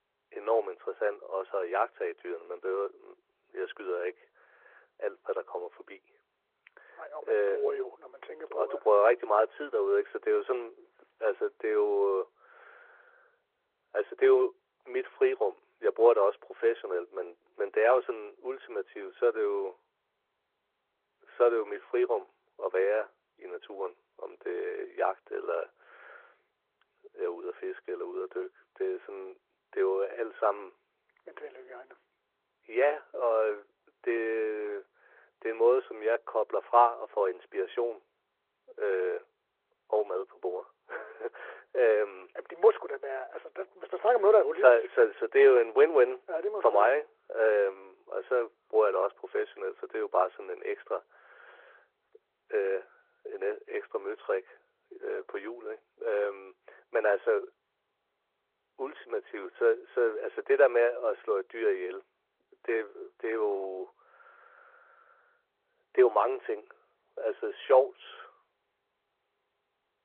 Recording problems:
muffled; very; fading above 1.5 kHz
phone-call audio
garbled, watery; slightly

